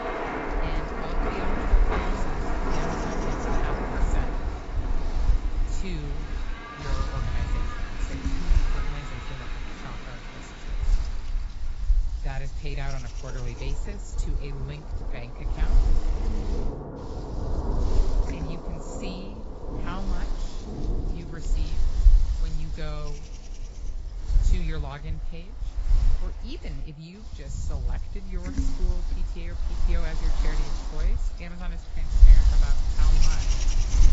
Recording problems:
garbled, watery; badly; nothing above 7.5 kHz
rain or running water; very loud; throughout; 5 dB above the speech
wind noise on the microphone; heavy; 1 dB below the speech

